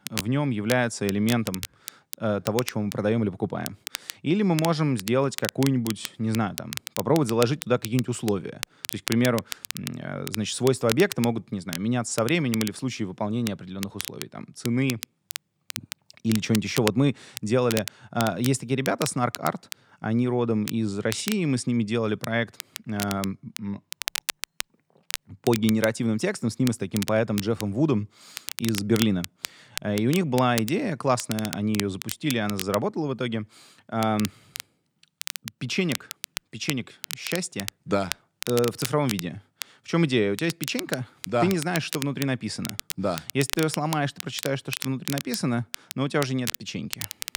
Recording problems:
crackle, like an old record; loud; 9 dB below the speech

